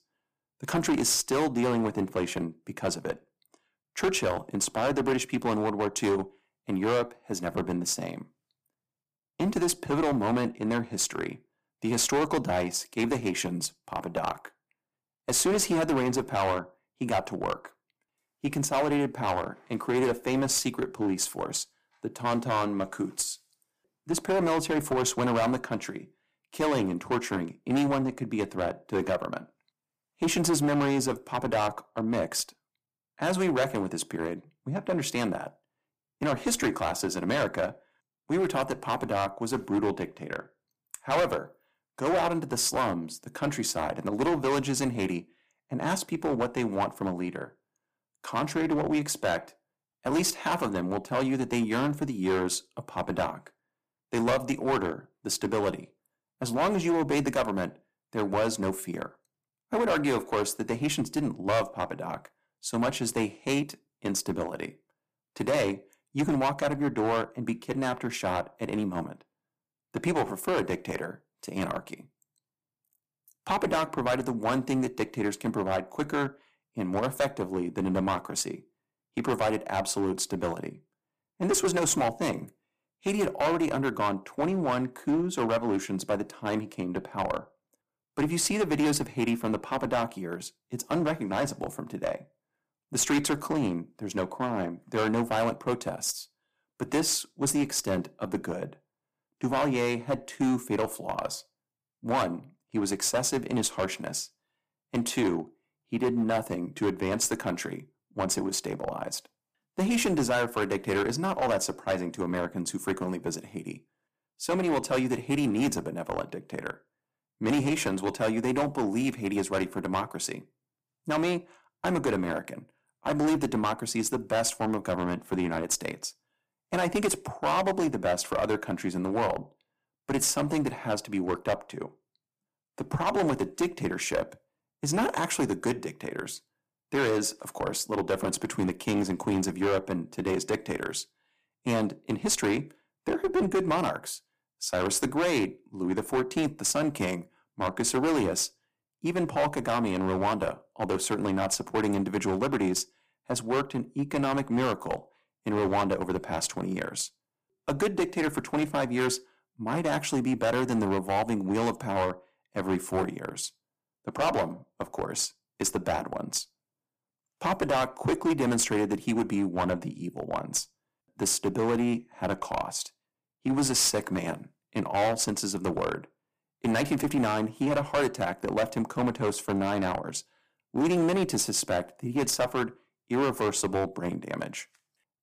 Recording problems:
distortion; heavy; 7% of the sound clipped

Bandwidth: 15 kHz